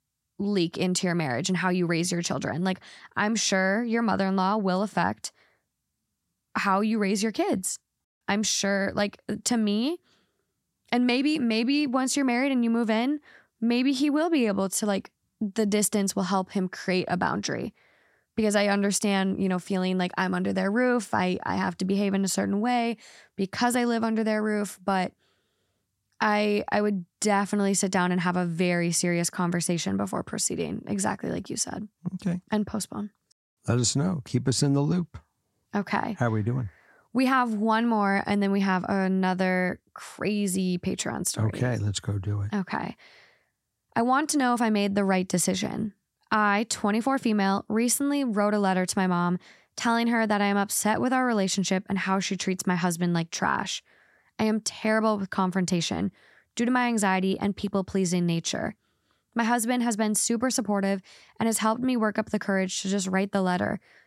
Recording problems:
none

